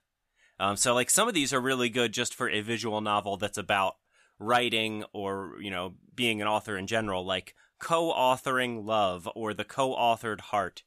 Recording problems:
none

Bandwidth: 14.5 kHz